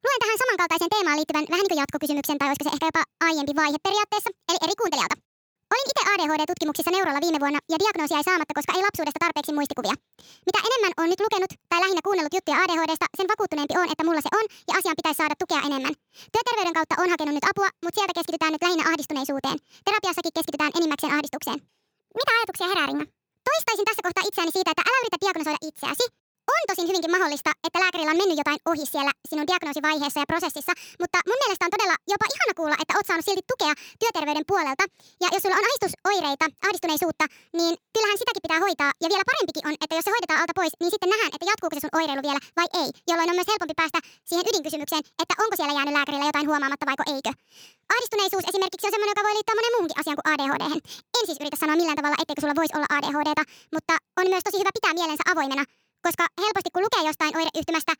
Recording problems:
wrong speed and pitch; too fast and too high; 1.5 times normal speed

